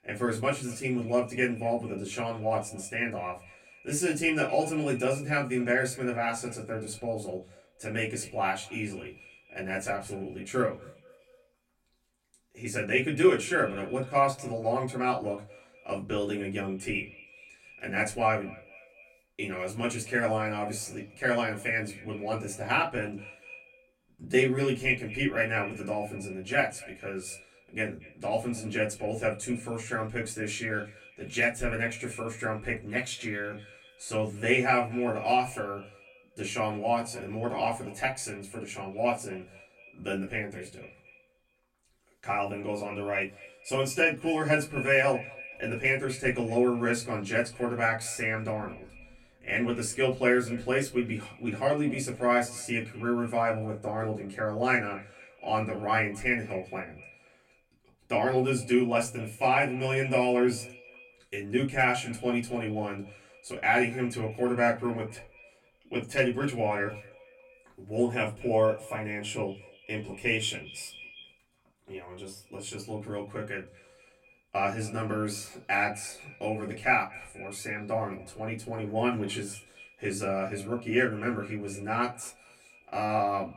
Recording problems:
off-mic speech; far
echo of what is said; faint; throughout; 240 ms later, 20 dB below the speech
room echo; very slight; dies away in 0.2 s

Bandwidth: 16 kHz